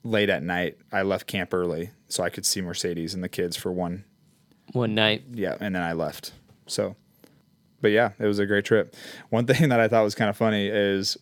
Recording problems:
none

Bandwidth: 17.5 kHz